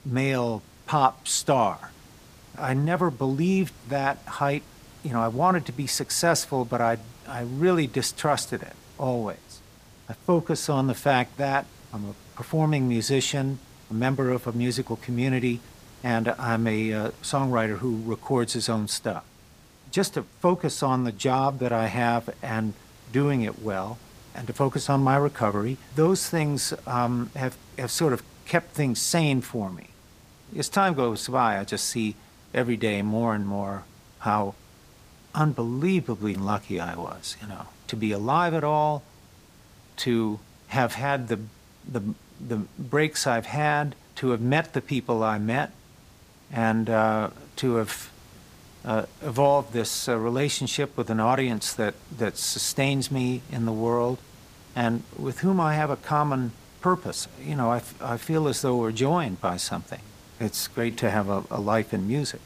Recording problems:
hiss; faint; throughout; 25 dB below the speech

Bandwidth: 15 kHz